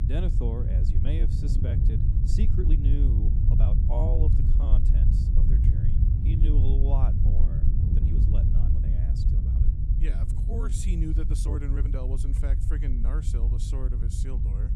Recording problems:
low rumble; loud; throughout; 1 dB below the speech
wind noise on the microphone; occasional gusts; until 11 s; 10 dB below the speech
murmuring crowd; faint; throughout; 30 dB below the speech
uneven, jittery; strongly; from 1 to 12 s

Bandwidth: 15 kHz